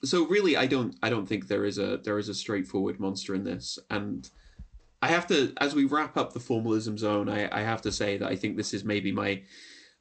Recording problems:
garbled, watery; slightly; nothing above 8 kHz

